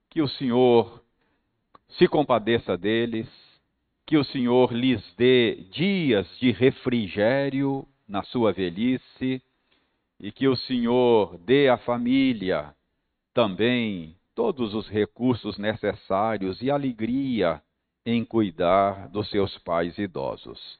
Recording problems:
high frequencies cut off; severe; nothing above 4.5 kHz

